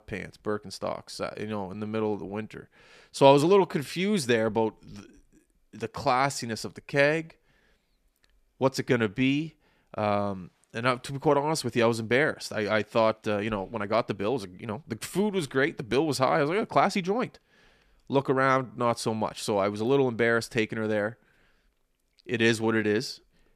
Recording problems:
uneven, jittery; strongly; from 1.5 to 23 s

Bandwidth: 14.5 kHz